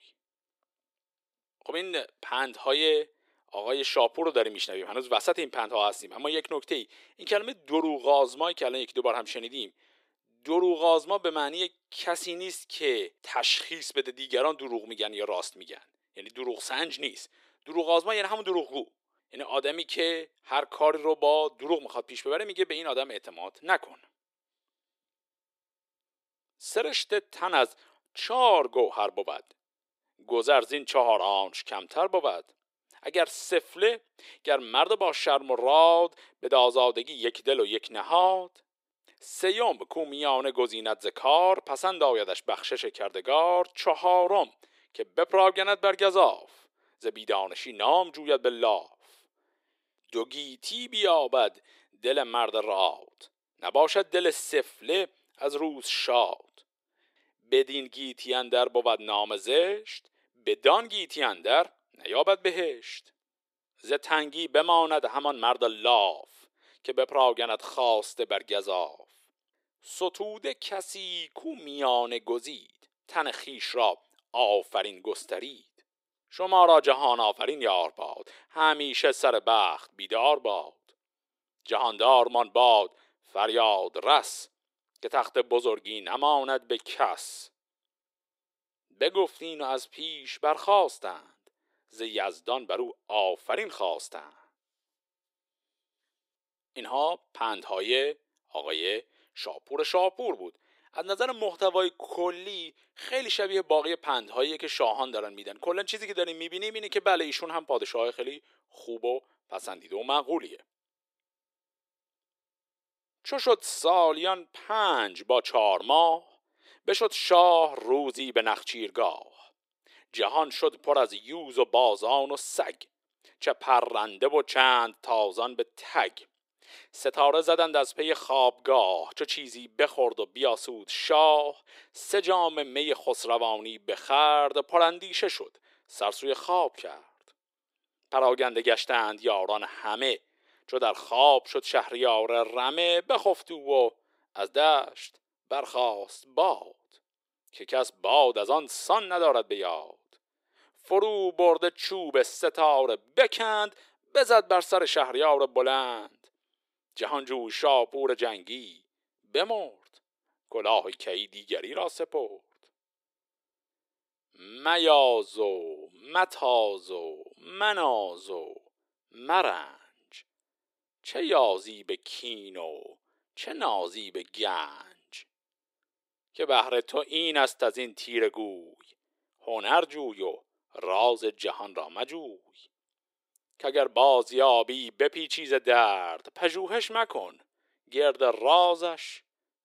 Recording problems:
thin; very; fading below 350 Hz

